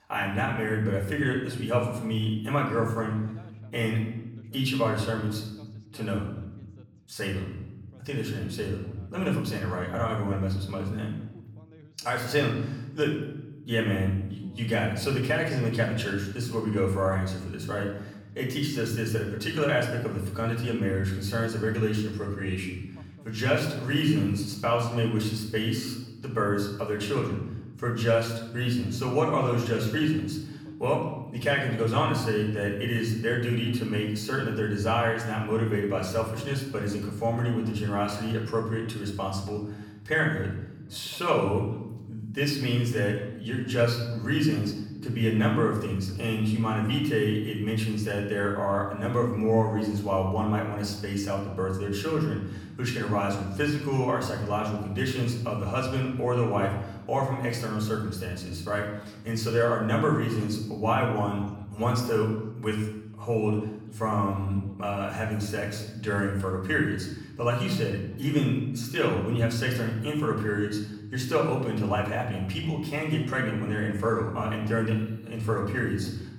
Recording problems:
off-mic speech; far
room echo; noticeable; dies away in 0.9 s
voice in the background; faint; throughout; 30 dB below the speech

